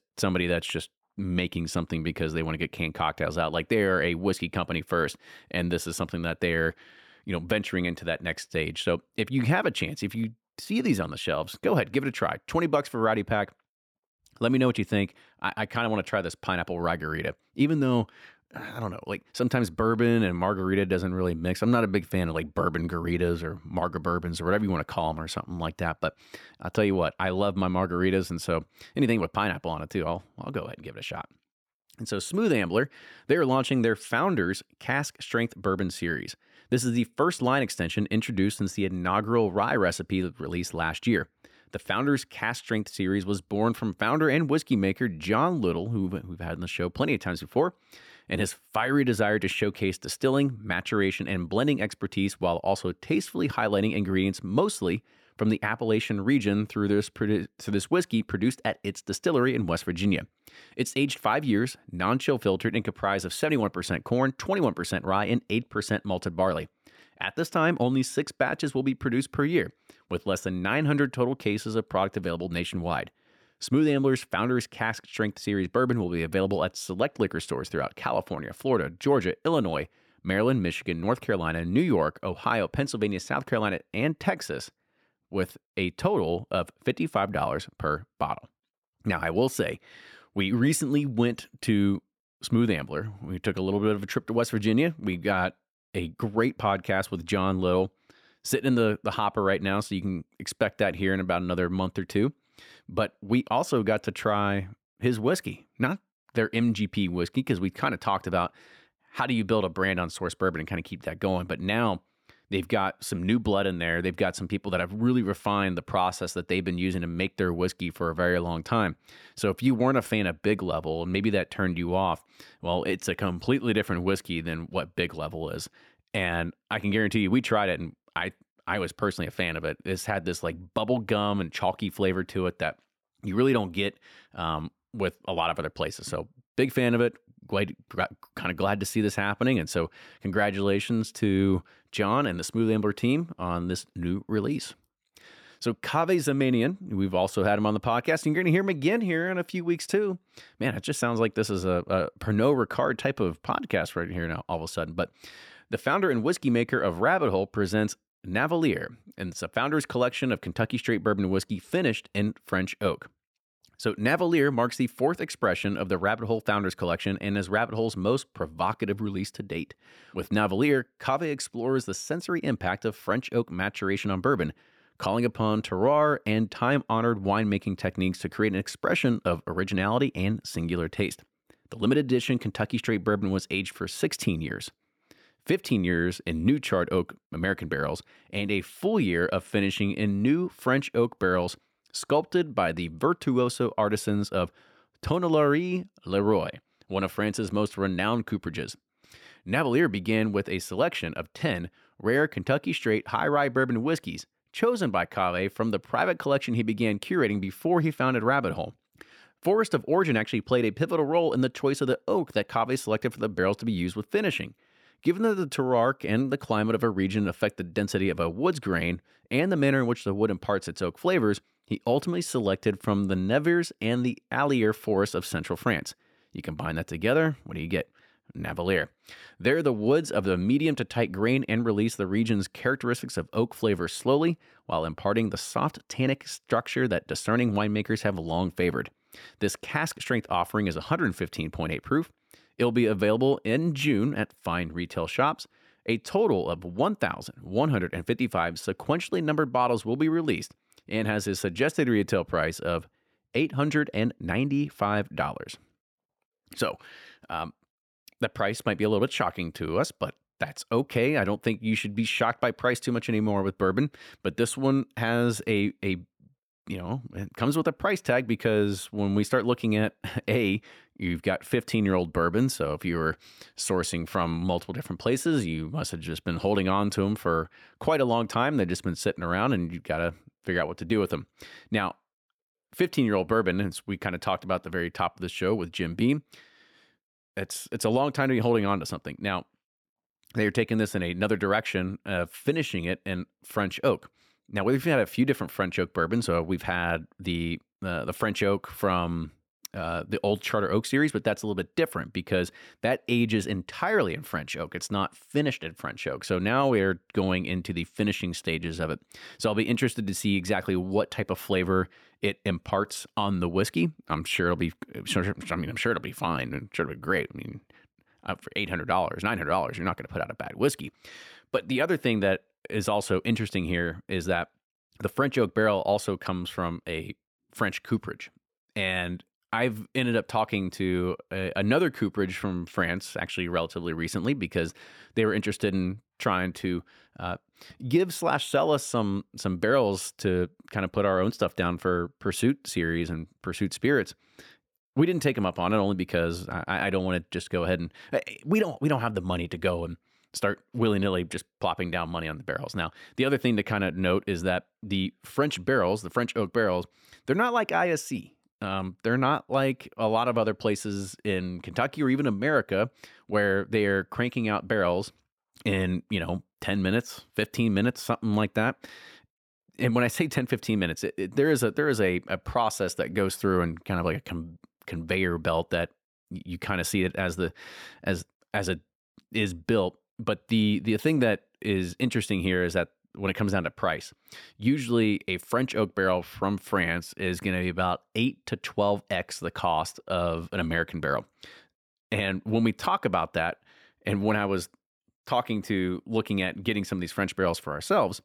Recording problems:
none

